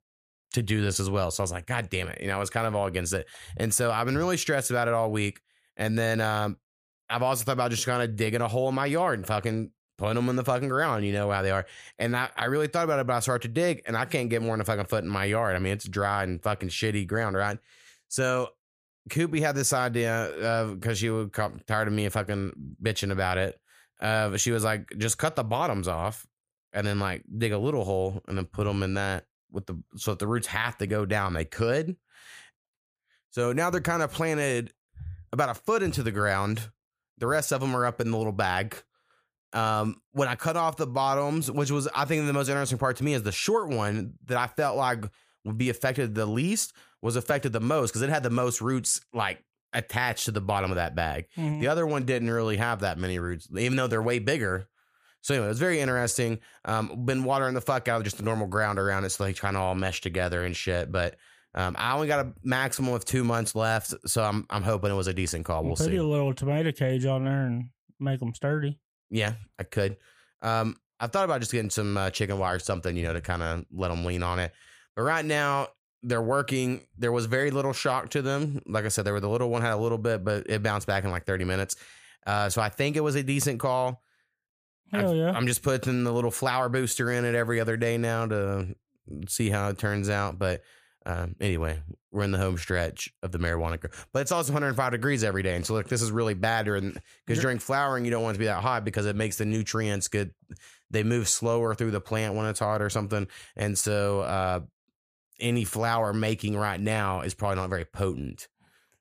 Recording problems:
none

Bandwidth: 15 kHz